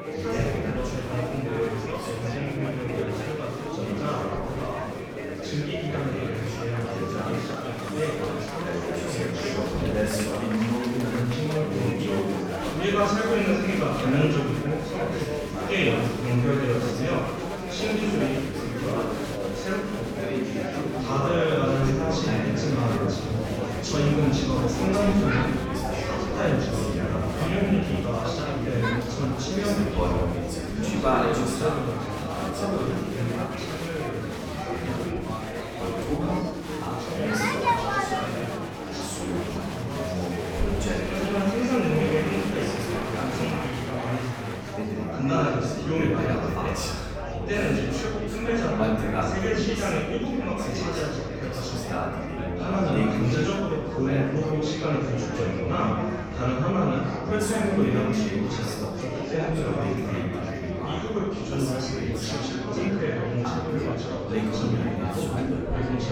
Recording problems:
off-mic speech; far
room echo; noticeable; dies away in 1.2 s
chatter from many people; very loud; throughout; 5 dB above the speech
background music; loud; throughout; 10 dB below the speech
clattering dishes; faint; at 8 s; peak 10 dB below the speech

